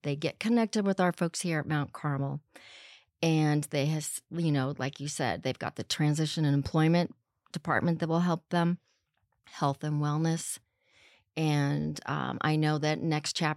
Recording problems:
none

